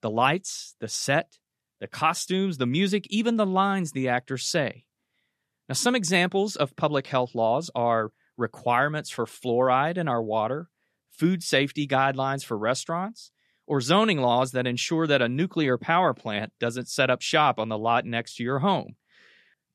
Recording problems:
none

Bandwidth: 13.5 kHz